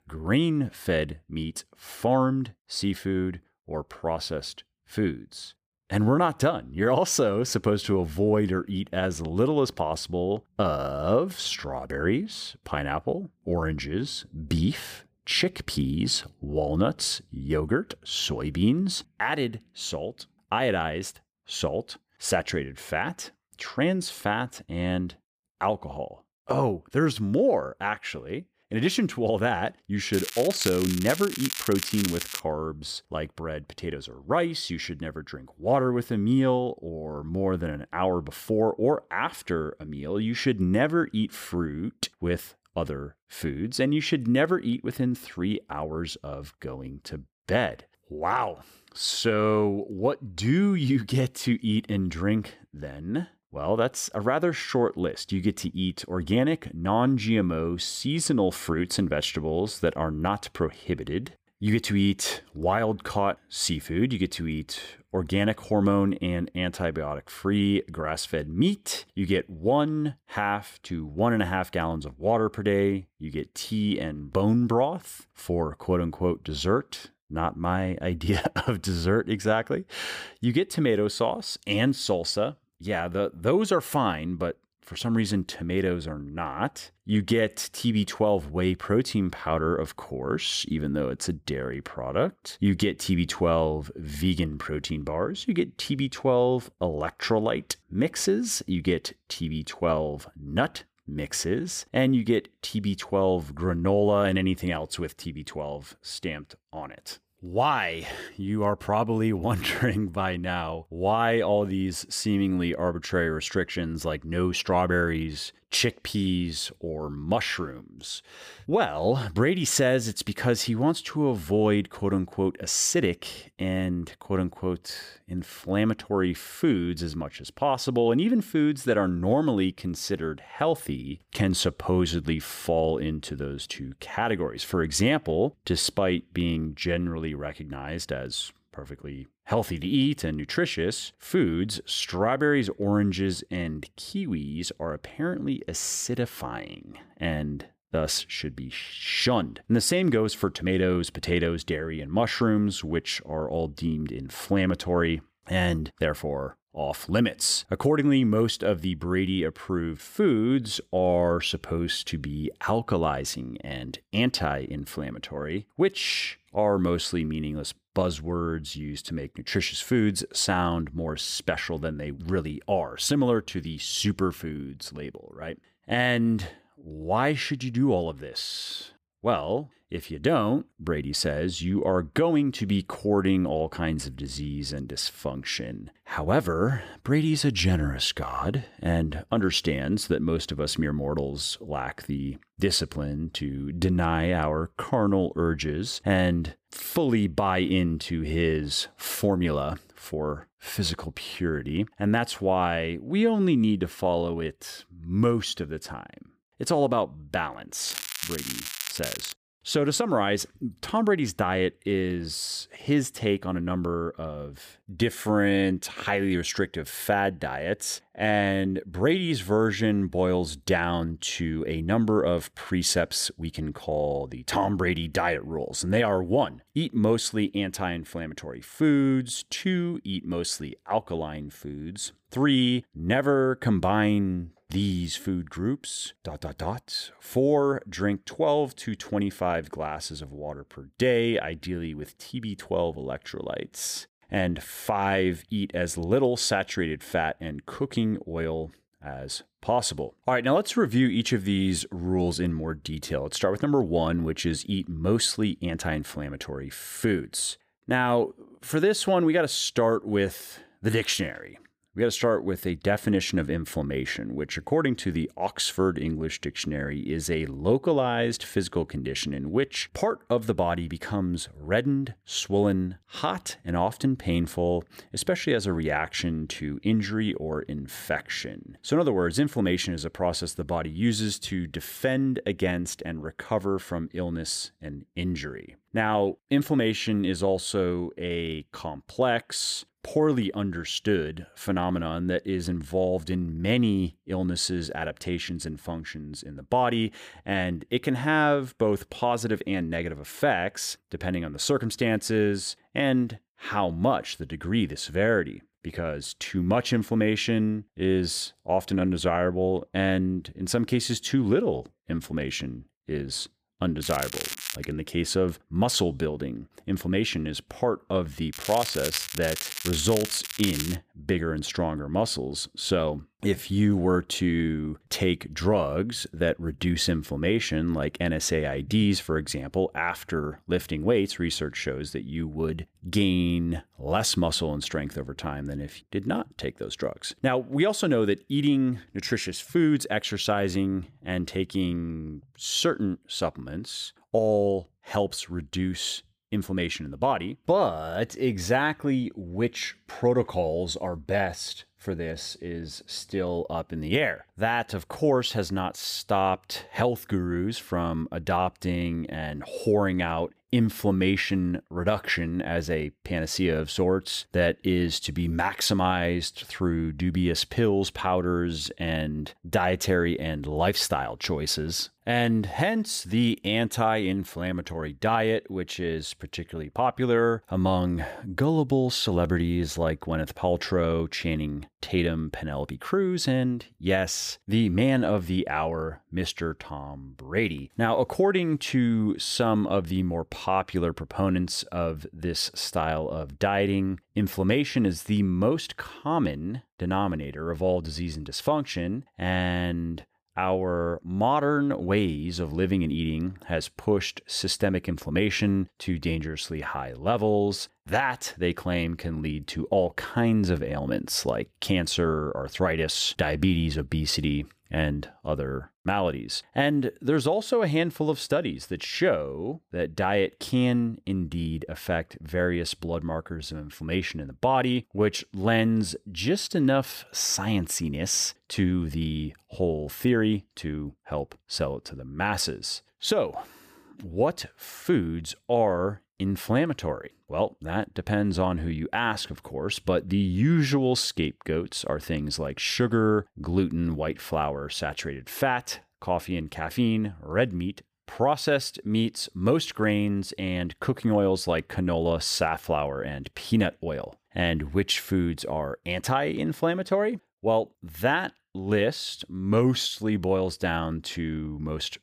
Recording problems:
crackling; loud; 4 times, first at 30 s; 6 dB below the speech

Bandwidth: 15 kHz